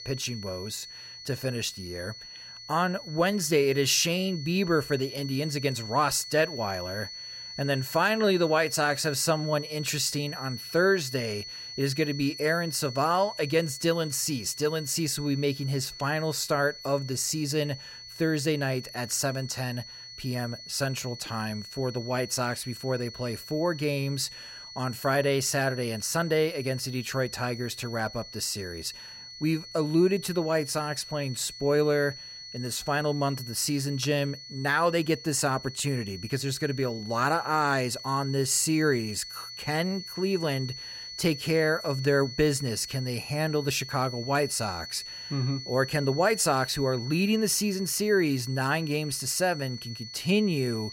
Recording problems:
high-pitched whine; noticeable; throughout; 4.5 kHz, 10 dB below the speech

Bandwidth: 16 kHz